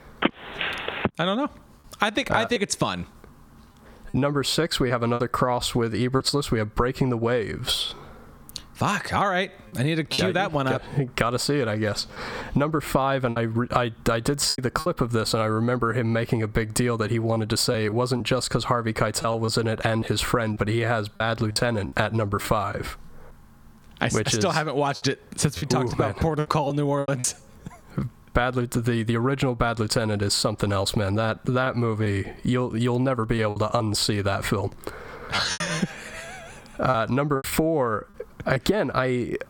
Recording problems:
squashed, flat; somewhat
choppy; occasionally; 5% of the speech affected
phone ringing; noticeable; at the start; peak 3 dB below the speech

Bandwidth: 18 kHz